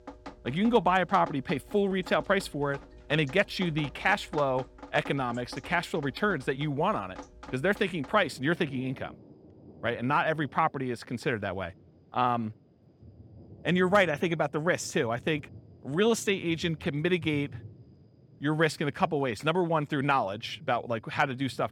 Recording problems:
rain or running water; faint; throughout; 20 dB below the speech

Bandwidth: 18 kHz